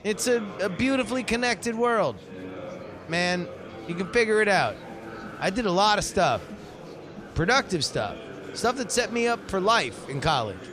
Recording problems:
murmuring crowd; noticeable; throughout; 15 dB below the speech

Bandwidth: 14.5 kHz